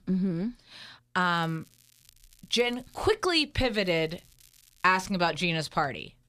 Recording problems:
crackling; faint; from 1 to 3 s and from 4 to 5 s; 30 dB below the speech

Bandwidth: 14.5 kHz